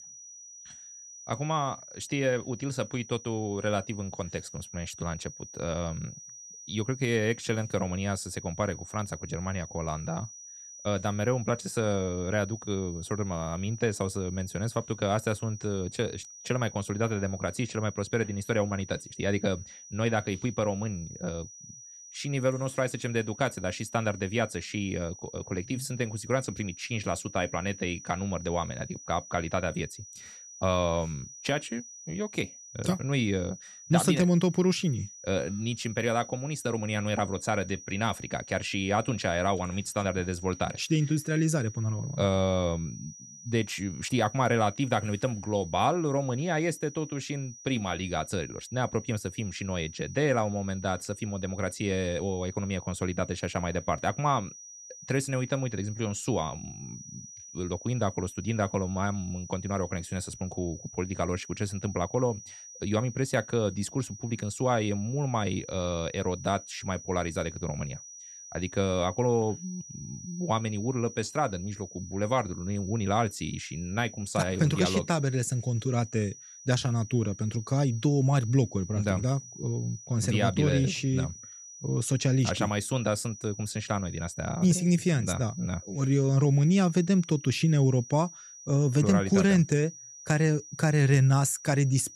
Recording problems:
high-pitched whine; noticeable; throughout; 6 kHz, 15 dB below the speech

